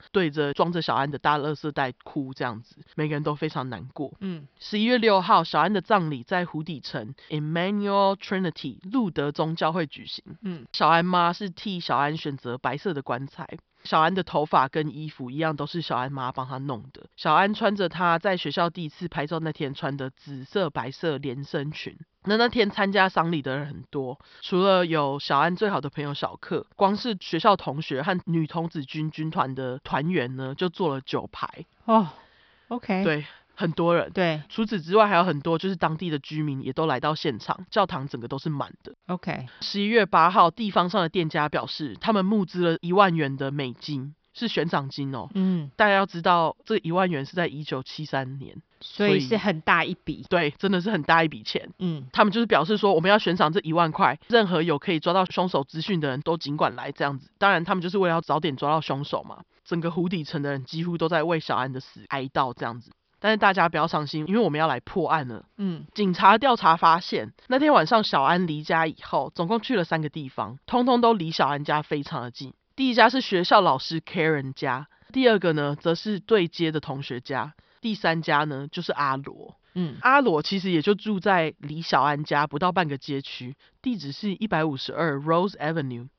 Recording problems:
high frequencies cut off; noticeable; nothing above 5.5 kHz

